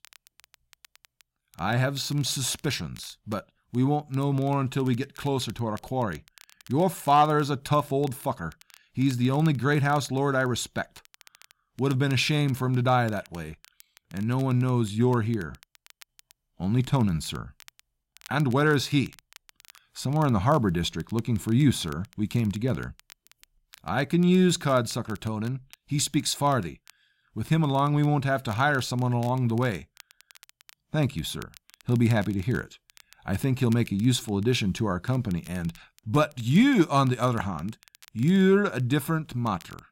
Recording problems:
crackle, like an old record; faint; 25 dB below the speech

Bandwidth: 16 kHz